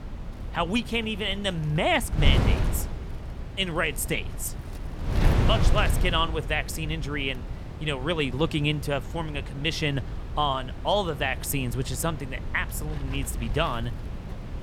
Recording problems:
wind noise on the microphone; occasional gusts; 10 dB below the speech

